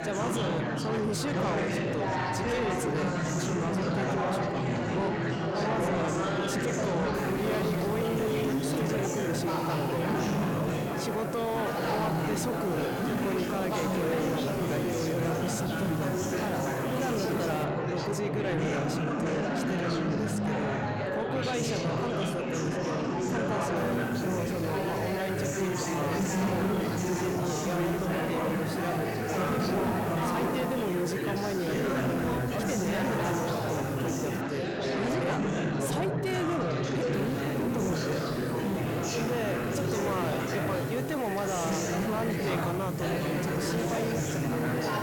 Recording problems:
distortion; slight; 10 dB below the speech
chatter from many people; very loud; throughout; 3 dB above the speech
hiss; noticeable; from 7 to 18 s, from 24 to 34 s and from 37 s on; 15 dB below the speech

